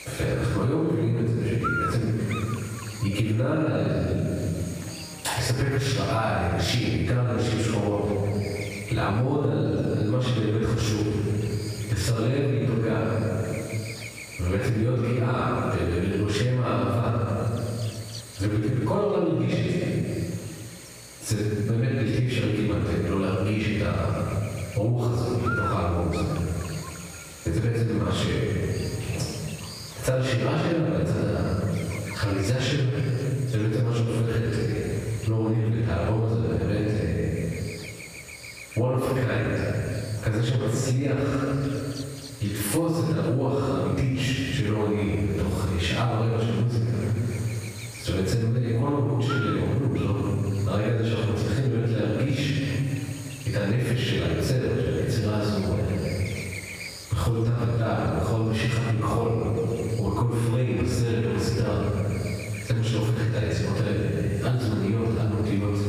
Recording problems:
room echo; strong; dies away in 1.4 s
off-mic speech; far
squashed, flat; heavily
electrical hum; loud; throughout; 60 Hz, 9 dB below the speech

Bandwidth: 15 kHz